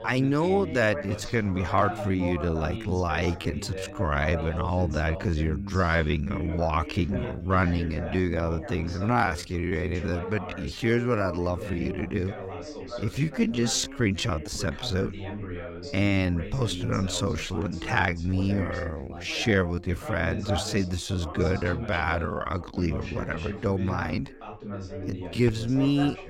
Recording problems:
wrong speed, natural pitch; too slow; 0.6 times normal speed
background chatter; loud; throughout; 2 voices, 10 dB below the speech

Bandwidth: 16 kHz